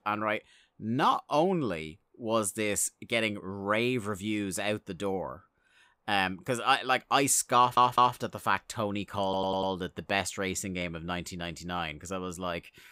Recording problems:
audio stuttering; at 7.5 s and at 9 s

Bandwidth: 15.5 kHz